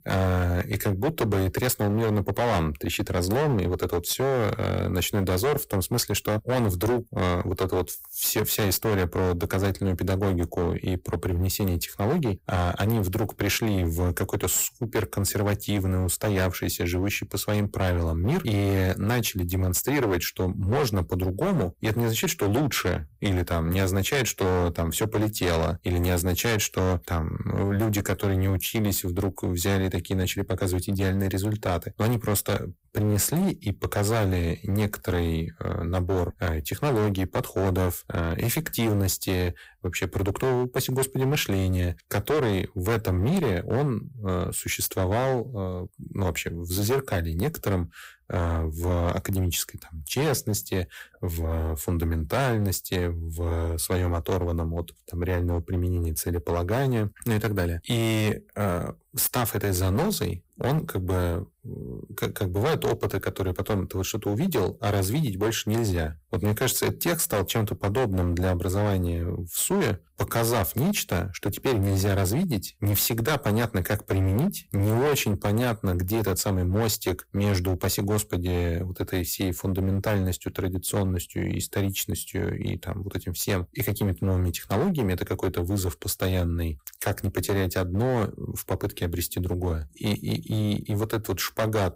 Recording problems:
distortion; heavy; 15% of the sound clipped

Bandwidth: 15.5 kHz